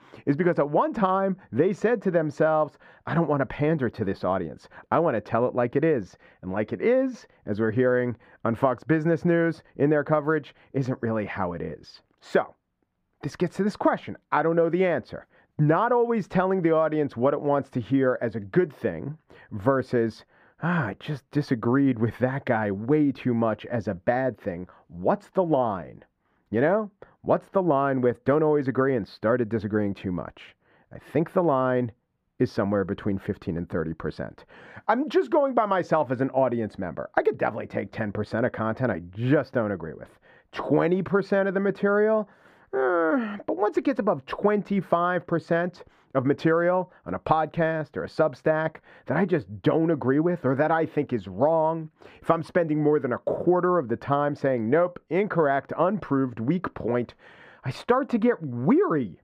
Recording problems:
muffled; very; fading above 3.5 kHz

